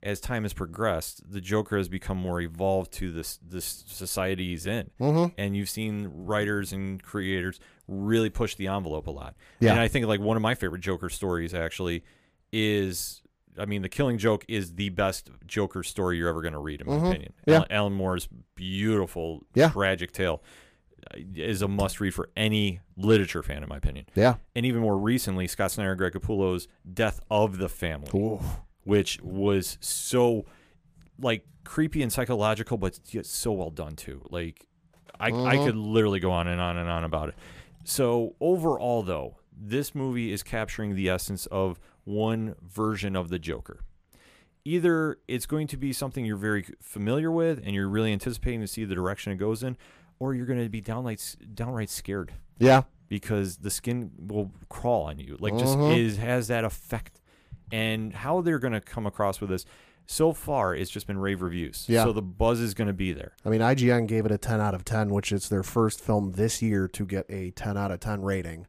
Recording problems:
none

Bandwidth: 15 kHz